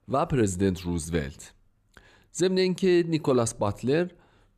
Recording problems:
none

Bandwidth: 14.5 kHz